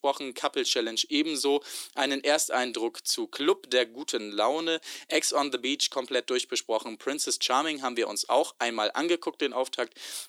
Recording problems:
thin; somewhat; fading below 300 Hz

